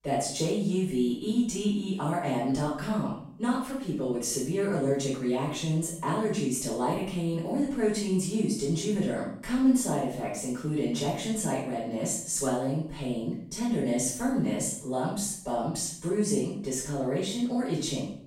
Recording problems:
off-mic speech; far
room echo; noticeable; dies away in 0.5 s

